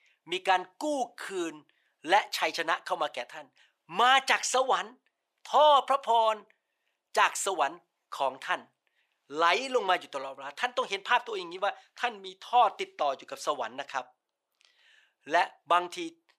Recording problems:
thin; very; fading below 700 Hz

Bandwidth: 15 kHz